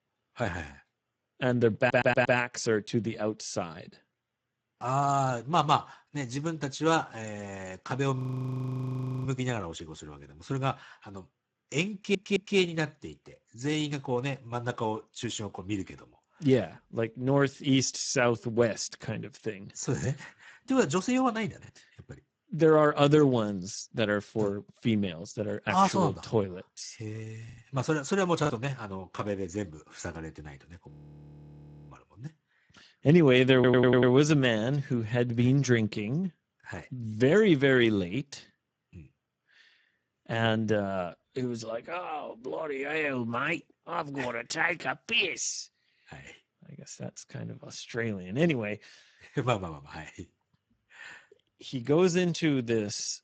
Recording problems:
garbled, watery; badly; nothing above 7.5 kHz
audio stuttering; at 2 s, at 12 s and at 34 s
audio freezing; at 8 s for 1 s and at 31 s for 1 s
choppy; occasionally; at 22 s and from 28 to 29 s; 3% of the speech affected

